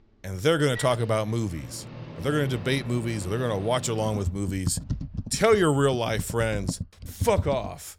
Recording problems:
household noises; noticeable; throughout; 10 dB below the speech

